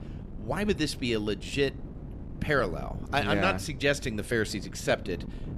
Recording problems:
wind noise on the microphone; occasional gusts; 20 dB below the speech

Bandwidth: 13.5 kHz